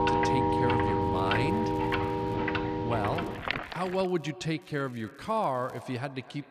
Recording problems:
echo of what is said; noticeable; throughout; 250 ms later, 15 dB below the speech
household noises; very loud; until 3.5 s; 4 dB above the speech
crackling; faint; from 1 to 2.5 s, from 3 to 4.5 s and from 4.5 to 6 s; 30 dB below the speech

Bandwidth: 14.5 kHz